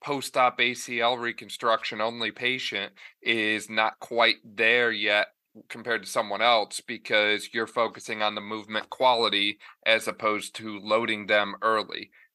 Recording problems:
thin; somewhat; fading below 1 kHz

